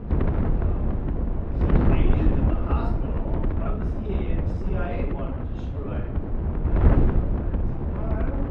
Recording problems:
off-mic speech; far
room echo; noticeable; dies away in 0.6 s
muffled; slightly; fading above 3 kHz
wind noise on the microphone; heavy; 4 dB above the speech
uneven, jittery; strongly; from 0.5 to 8 s

